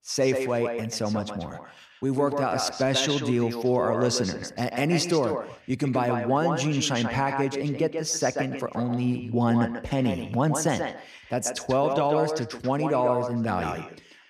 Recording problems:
echo of what is said; strong; throughout; 140 ms later, 6 dB below the speech

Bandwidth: 14.5 kHz